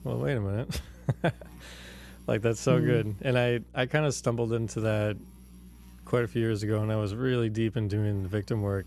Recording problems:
electrical hum; faint; throughout; 60 Hz, 30 dB below the speech

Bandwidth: 13.5 kHz